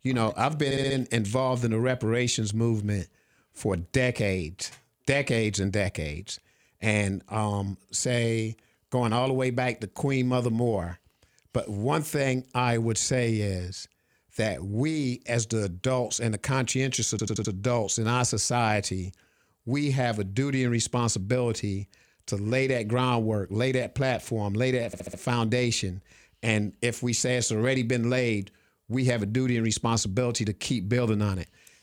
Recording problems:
audio stuttering; at 0.5 s, at 17 s and at 25 s

